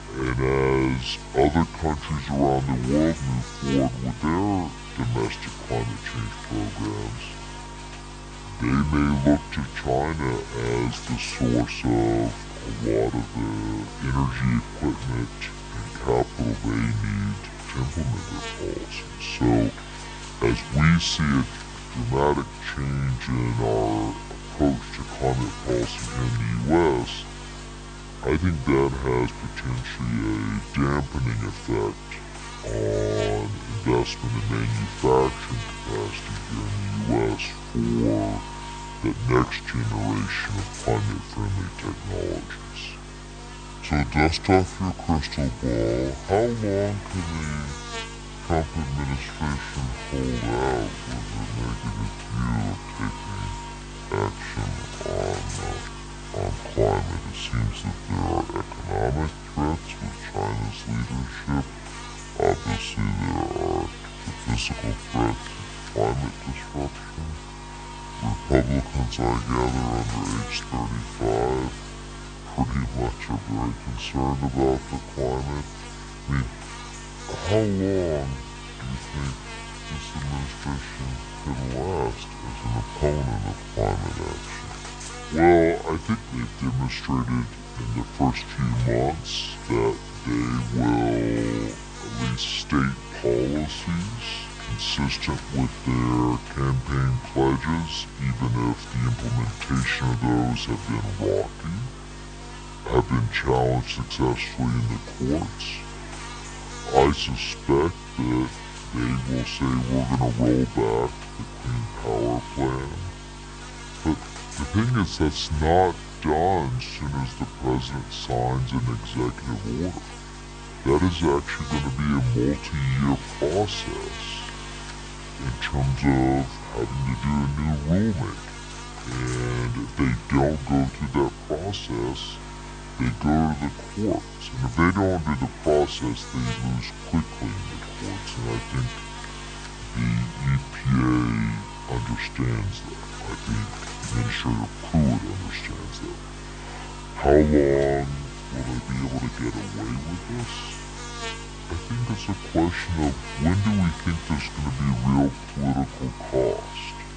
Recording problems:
wrong speed and pitch; too slow and too low; 0.6 times normal speed
electrical hum; loud; throughout; 50 Hz, 9 dB below the speech

